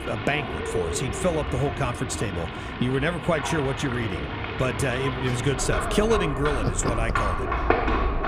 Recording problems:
animal sounds; loud; throughout; 2 dB below the speech

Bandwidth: 15 kHz